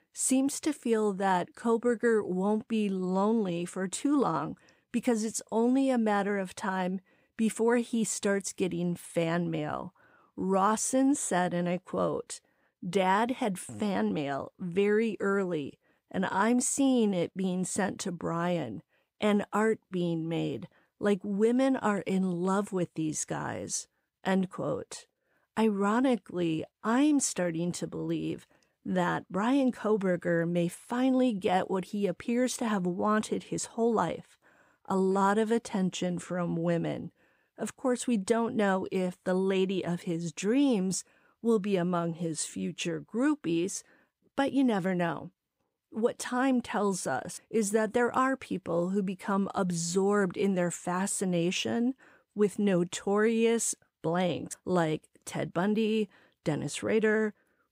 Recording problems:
none

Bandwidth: 15.5 kHz